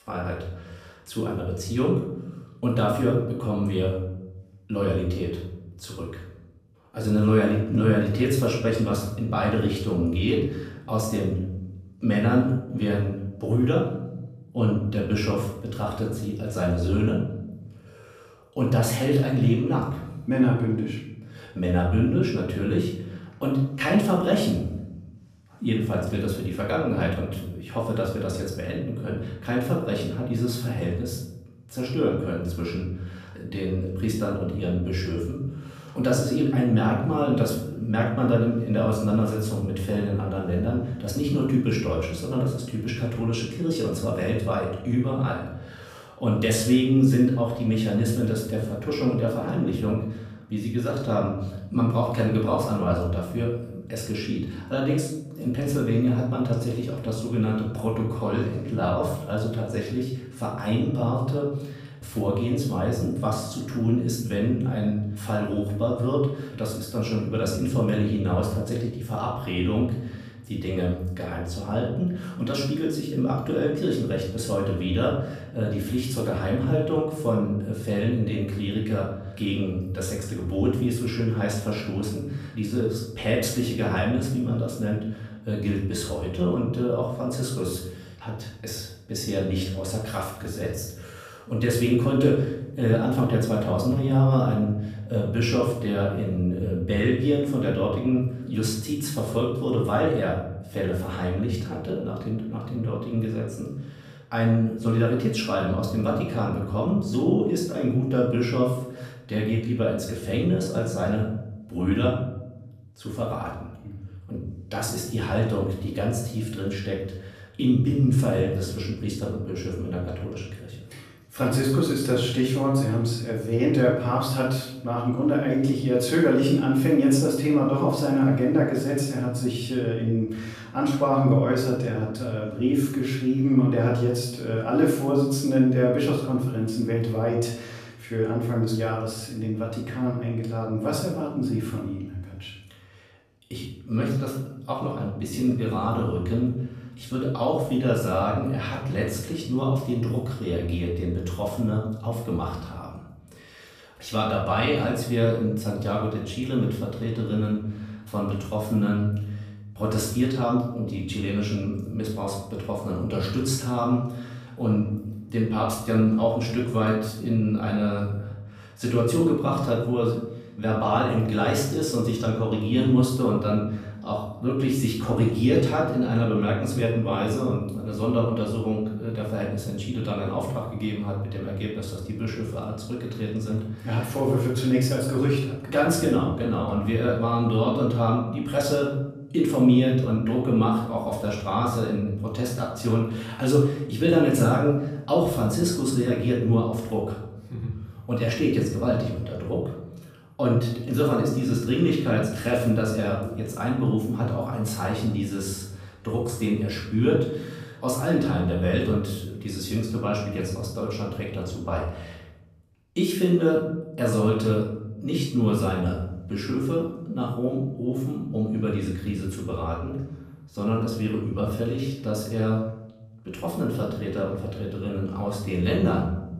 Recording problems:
off-mic speech; far
room echo; noticeable; dies away in 0.7 s

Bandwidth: 15 kHz